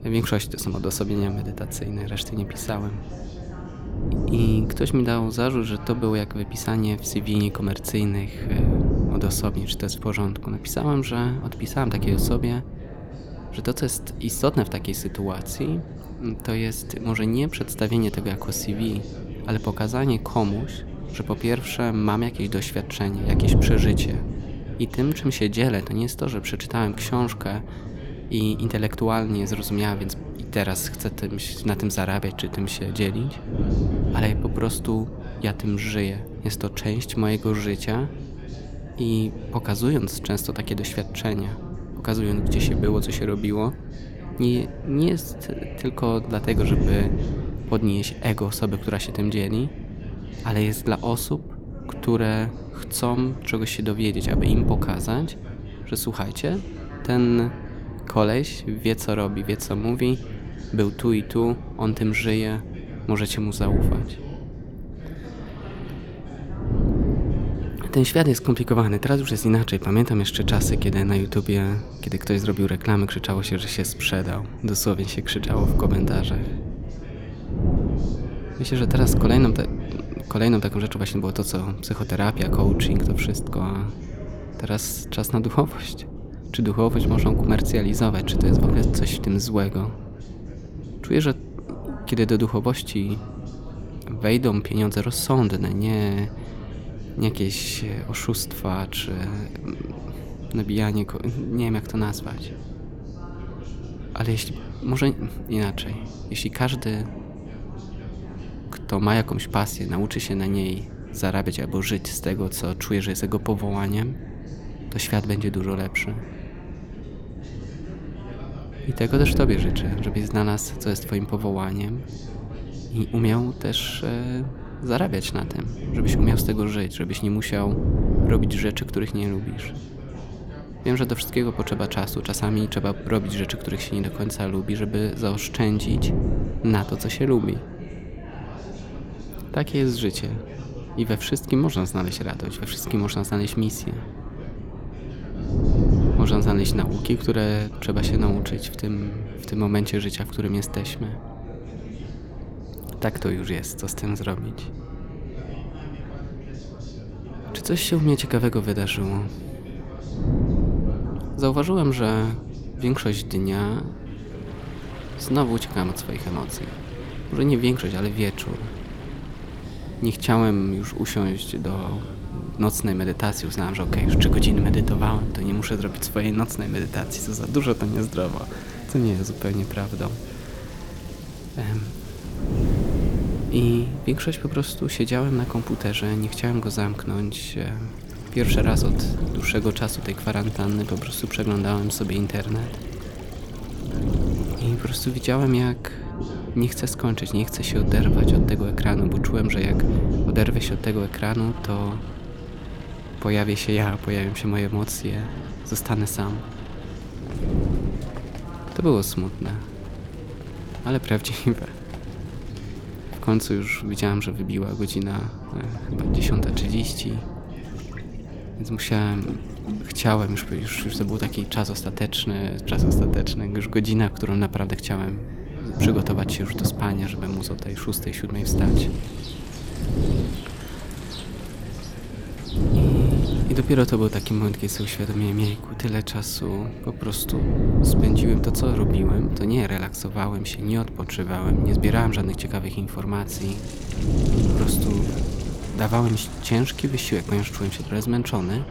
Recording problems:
wind noise on the microphone; heavy; 10 dB below the speech
rain or running water; noticeable; from 2:44 on; 15 dB below the speech
background chatter; noticeable; throughout; 3 voices, 15 dB below the speech

